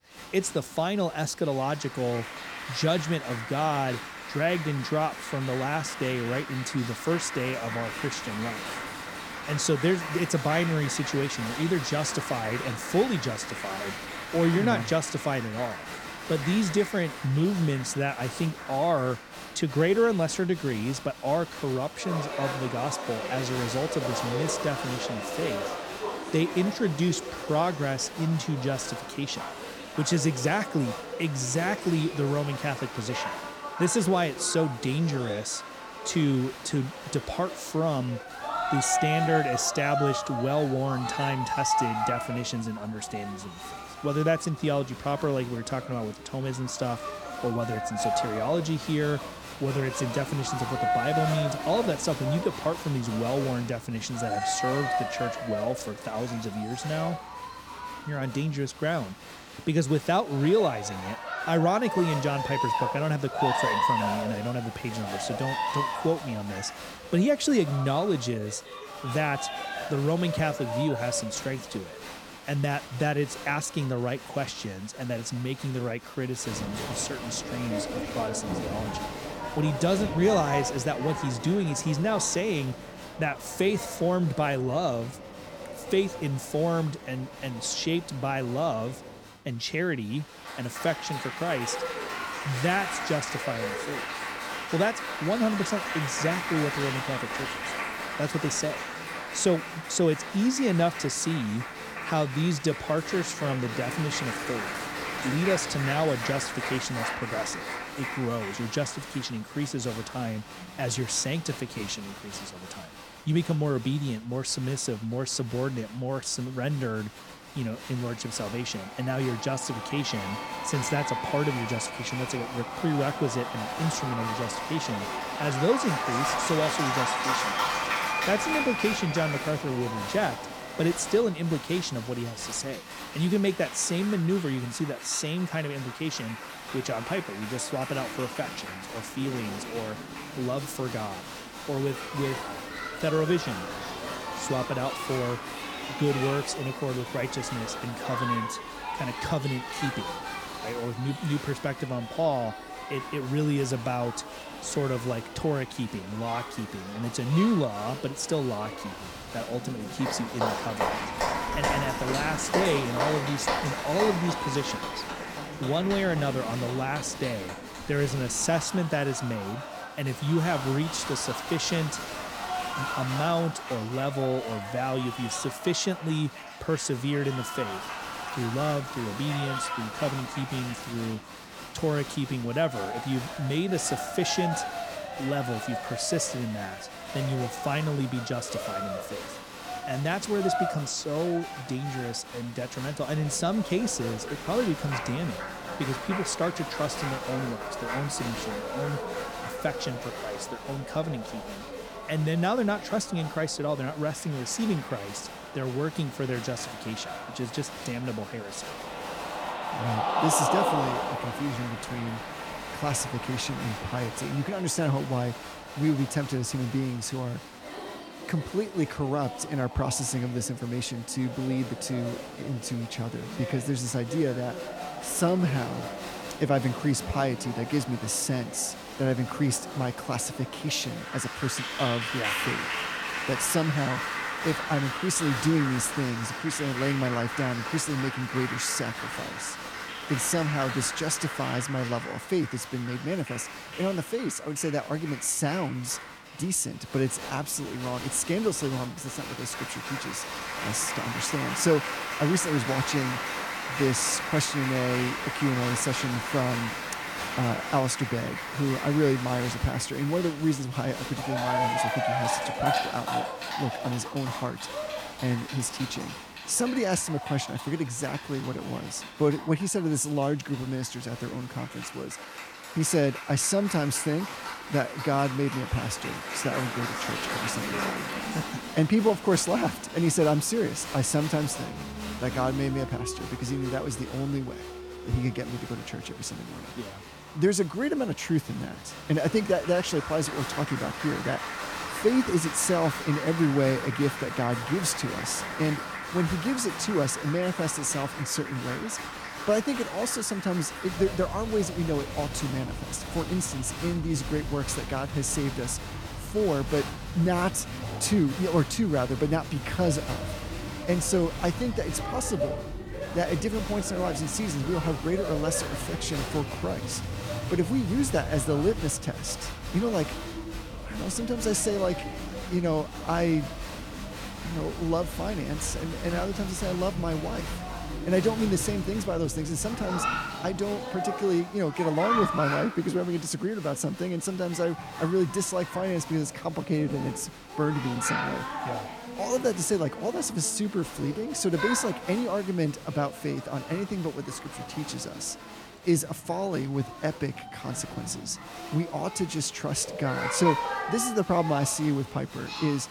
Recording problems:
crowd noise; loud; throughout; 5 dB below the speech

